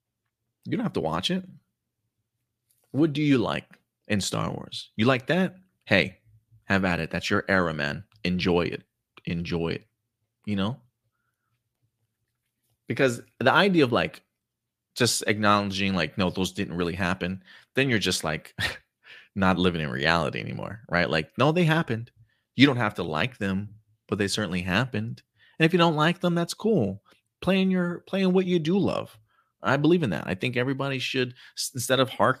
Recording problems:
none

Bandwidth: 15 kHz